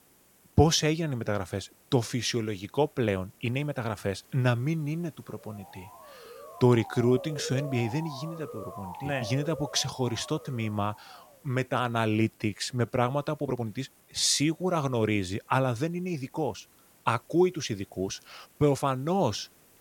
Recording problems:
hiss; faint; throughout; 30 dB below the speech
uneven, jittery; strongly; from 0.5 to 19 s
siren; noticeable; from 5.5 to 11 s; peak 10 dB below the speech

